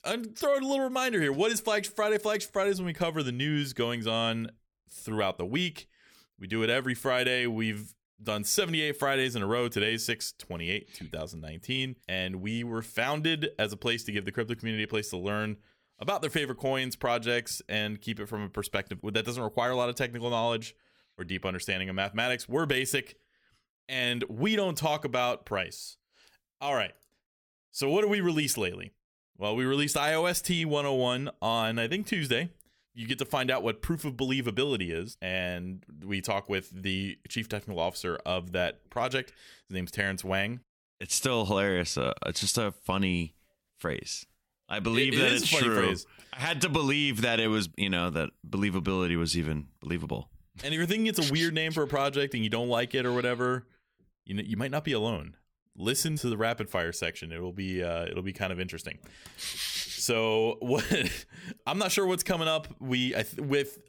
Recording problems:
none

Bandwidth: 18.5 kHz